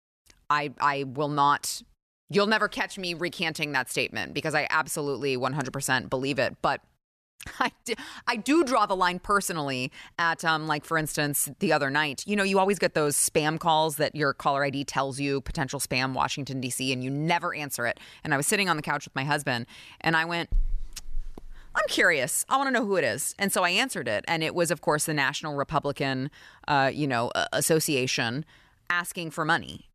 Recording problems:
none

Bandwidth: 14 kHz